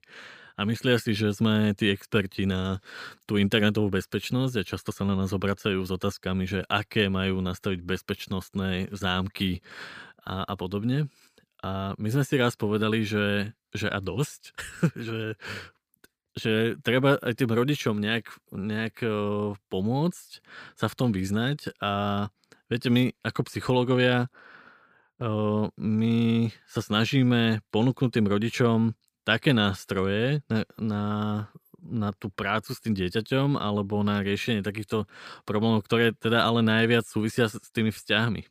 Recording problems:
none

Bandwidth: 15 kHz